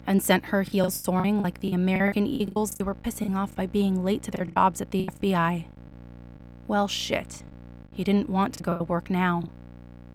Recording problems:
electrical hum; faint; throughout; 60 Hz, 25 dB below the speech
choppy; very; 13% of the speech affected

